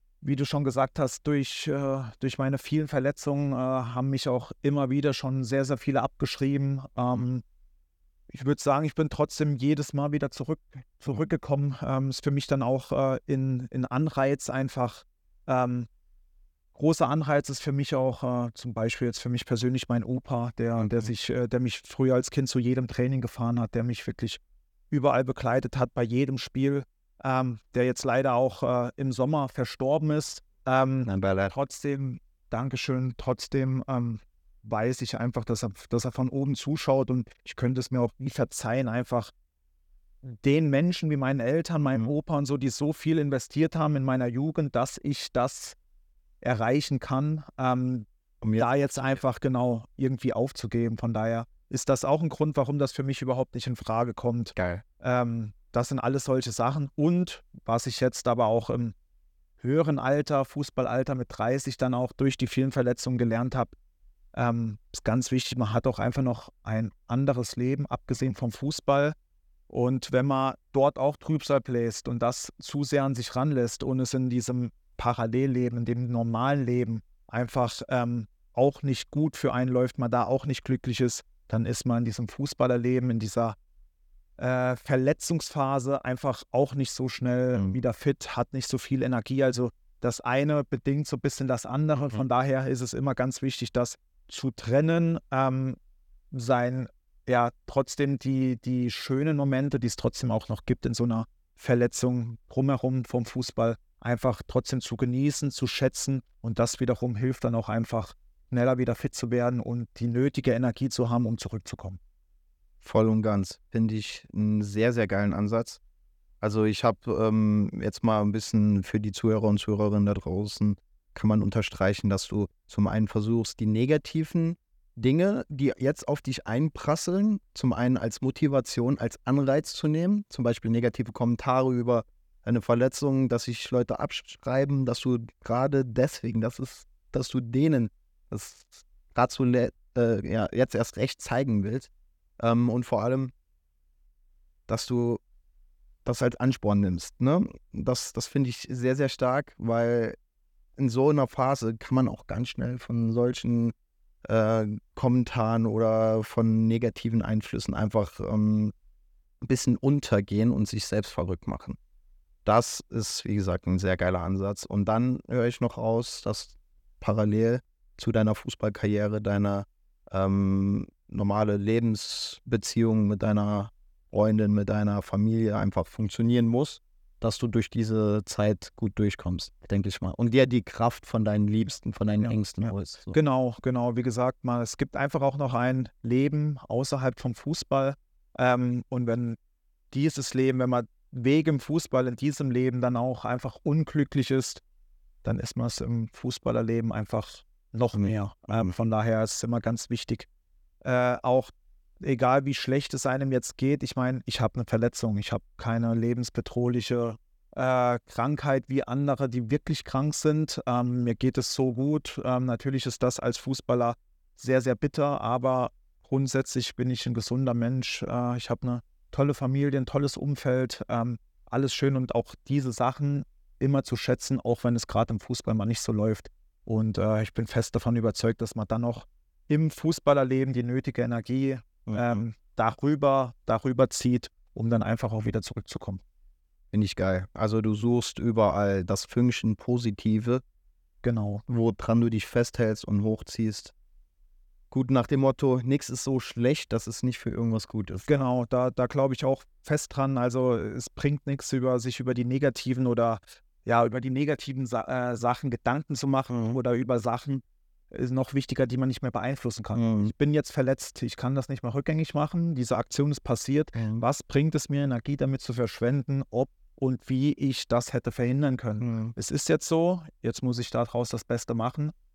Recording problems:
none

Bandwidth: 18.5 kHz